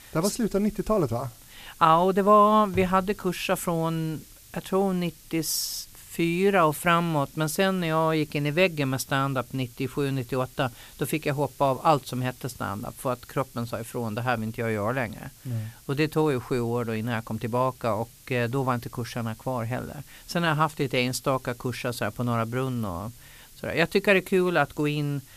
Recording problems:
hiss; faint; throughout; 25 dB below the speech

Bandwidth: 14.5 kHz